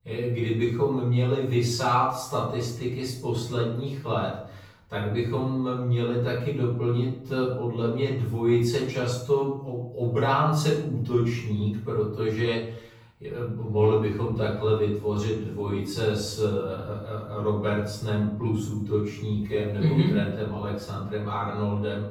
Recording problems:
off-mic speech; far
wrong speed, natural pitch; too slow; 0.7 times normal speed
room echo; noticeable; dies away in 0.6 s

